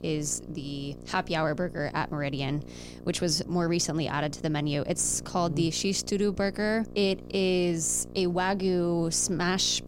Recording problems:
electrical hum; noticeable; throughout; 60 Hz, 20 dB below the speech

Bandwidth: 16 kHz